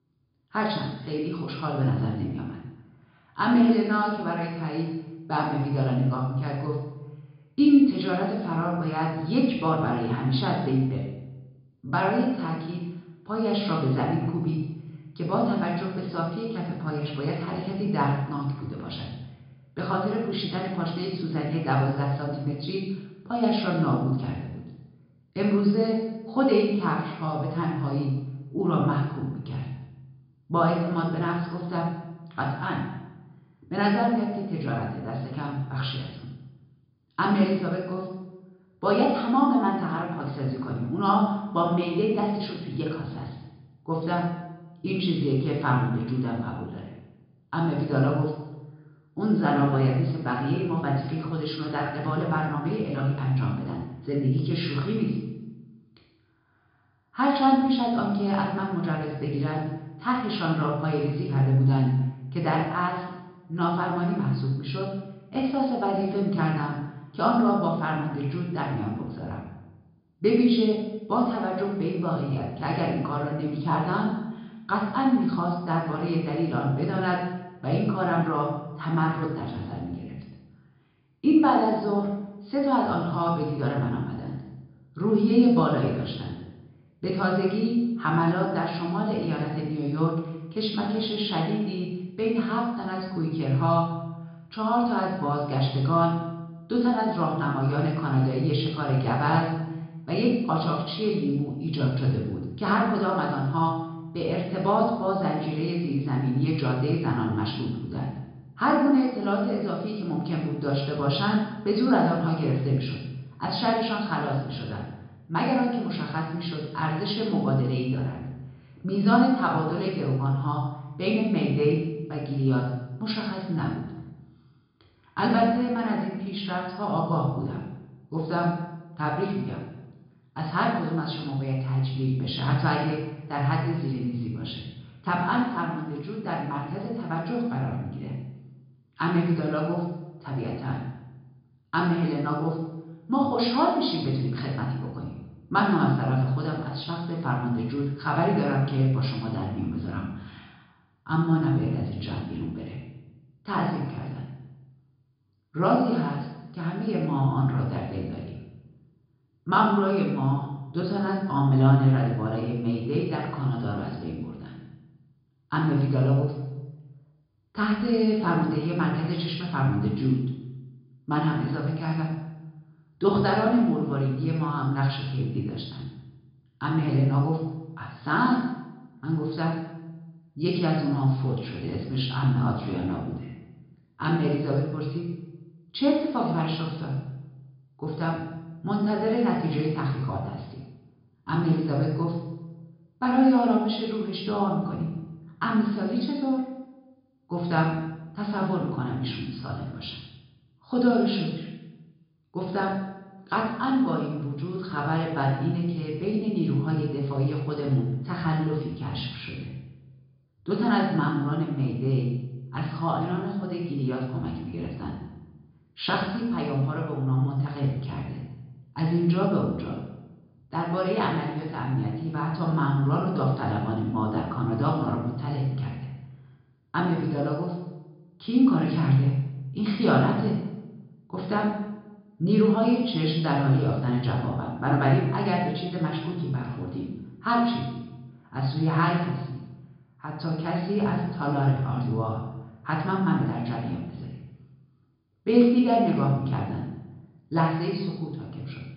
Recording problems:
off-mic speech; far
room echo; noticeable; dies away in 0.9 s
high frequencies cut off; noticeable; nothing above 5 kHz

